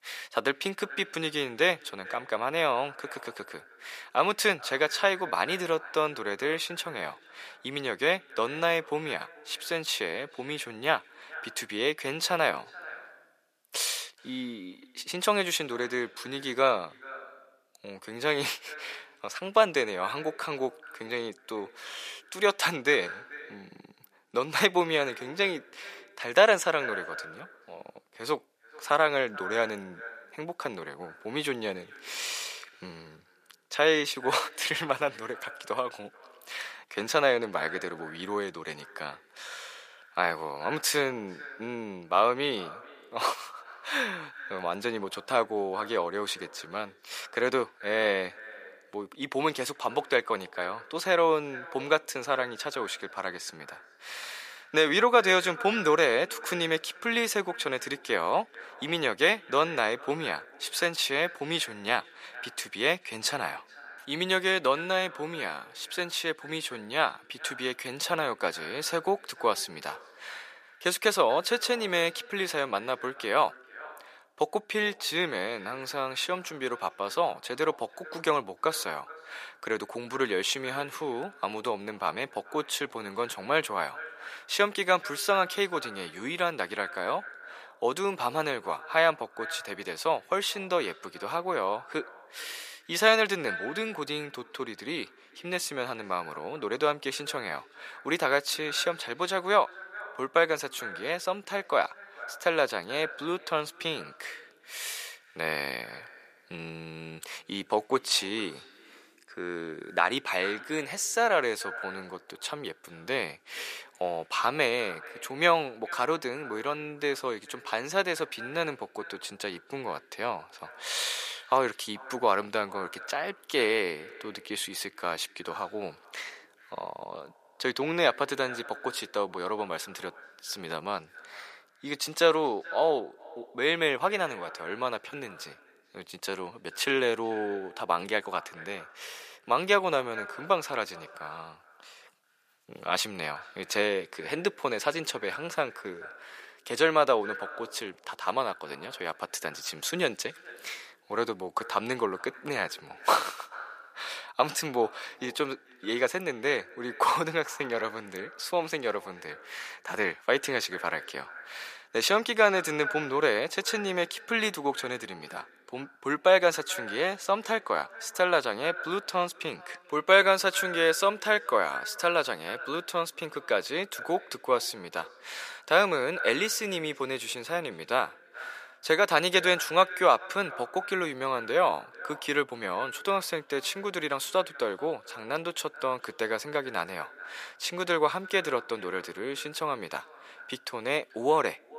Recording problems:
thin; very; fading below 550 Hz
echo of what is said; noticeable; throughout; 430 ms later, 15 dB below the speech

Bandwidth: 14.5 kHz